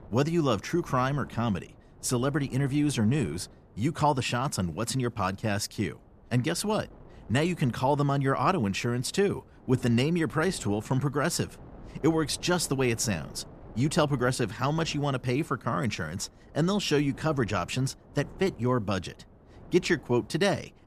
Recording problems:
wind noise on the microphone; occasional gusts; 25 dB below the speech

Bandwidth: 14.5 kHz